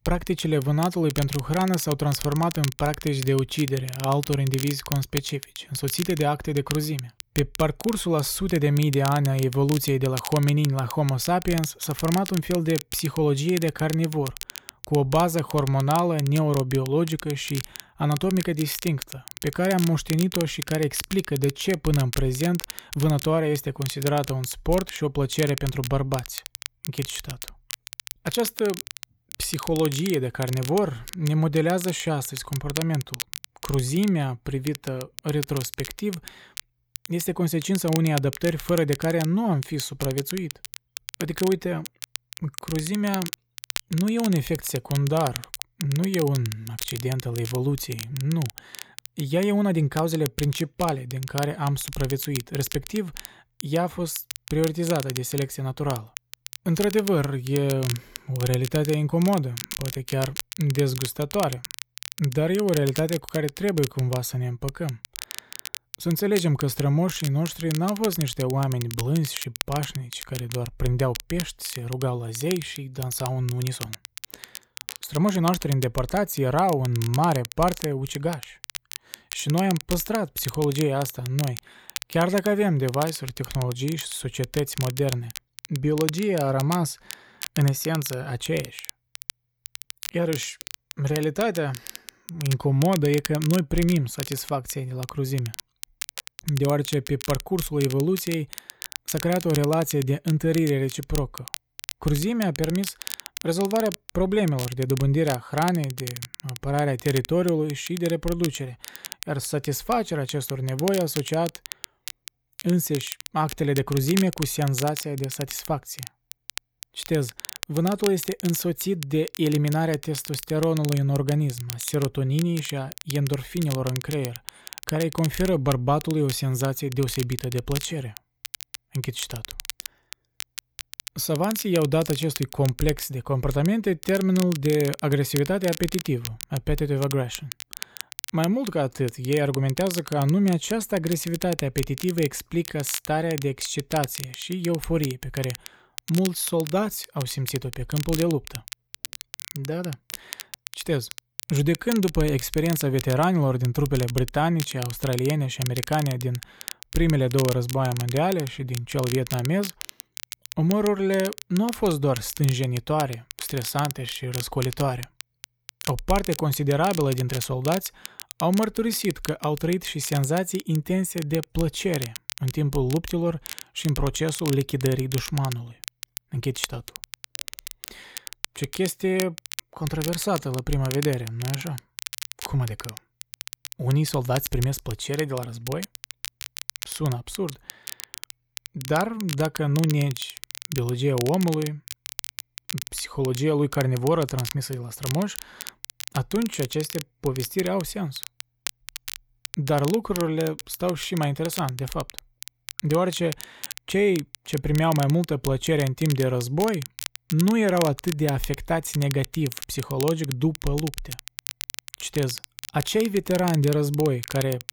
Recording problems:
crackle, like an old record; noticeable; 10 dB below the speech

